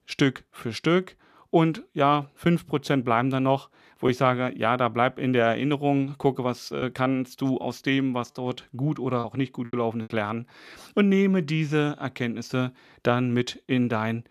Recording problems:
choppy; occasionally; from 7 to 10 s; 3% of the speech affected

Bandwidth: 14.5 kHz